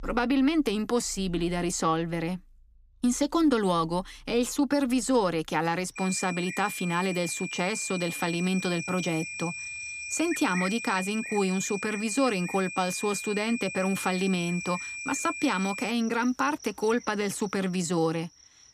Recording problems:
high-pitched whine; loud; from 6 to 16 s; 2.5 kHz, 8 dB below the speech
animal sounds; noticeable; throughout; 20 dB below the speech

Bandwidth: 15 kHz